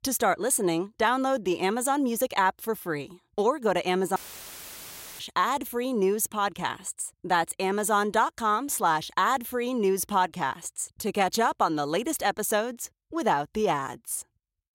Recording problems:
audio cutting out; filled with static; at 4 s for 1 s

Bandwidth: 16 kHz